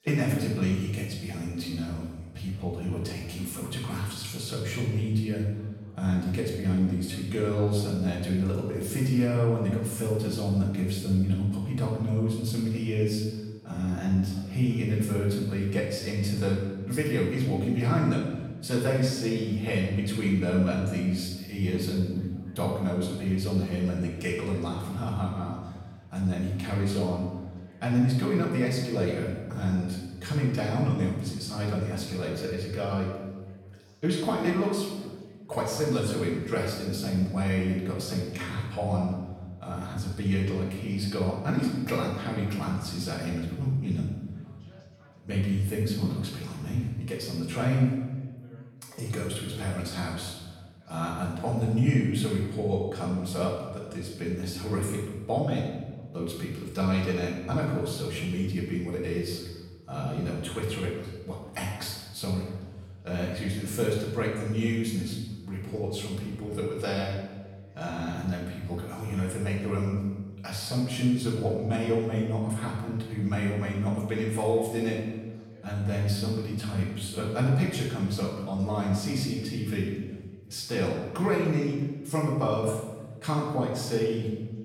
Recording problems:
off-mic speech; far
room echo; noticeable; dies away in 1.1 s
background chatter; faint; throughout; 3 voices, 30 dB below the speech

